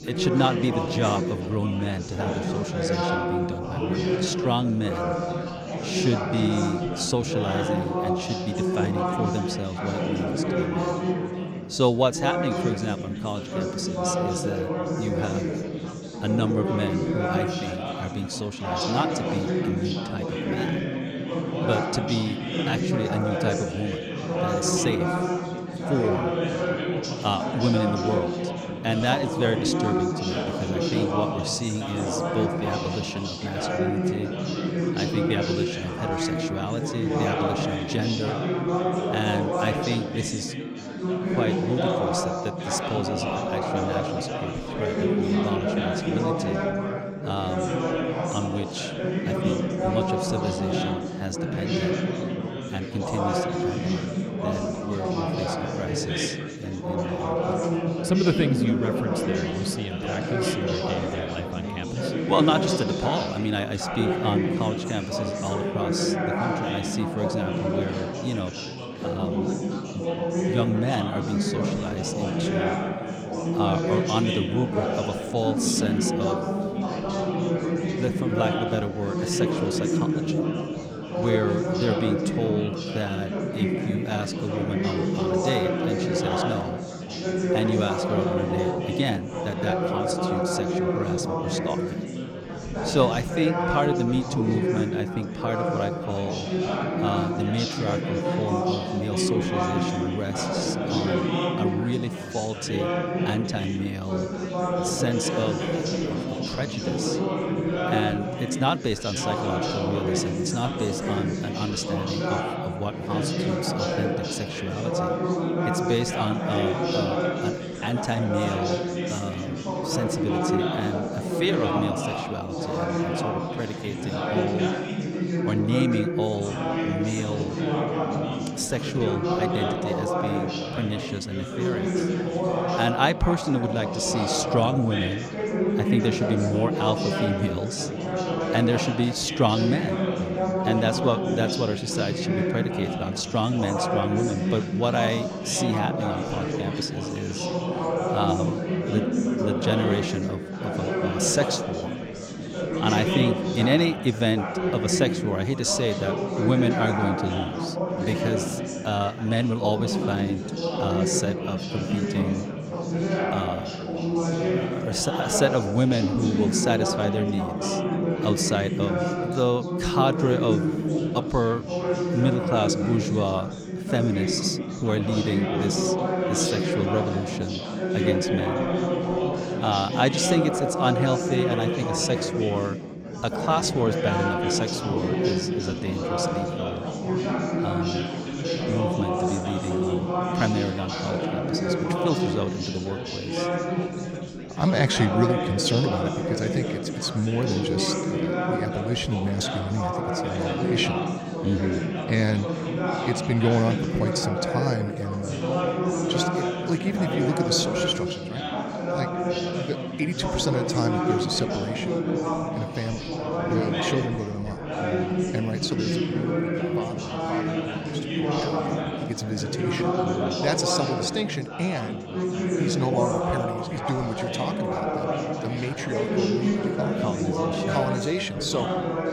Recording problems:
chatter from many people; very loud; throughout; 1 dB above the speech

